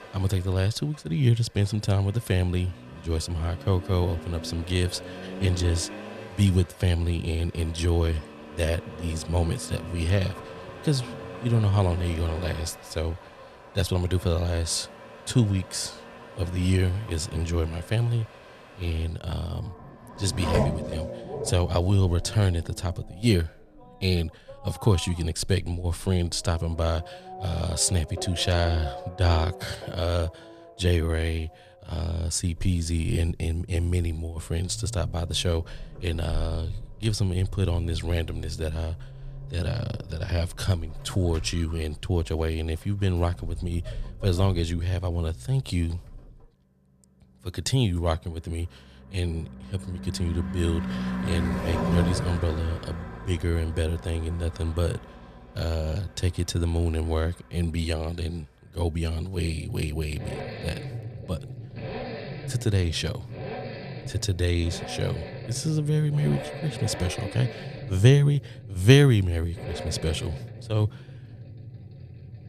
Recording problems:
traffic noise; noticeable; throughout; 10 dB below the speech

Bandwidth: 14.5 kHz